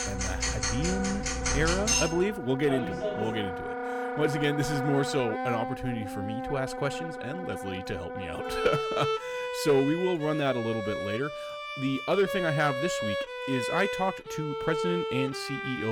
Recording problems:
household noises; very loud; until 3.5 s; as loud as the speech
background music; loud; throughout; 3 dB below the speech
abrupt cut into speech; at the end

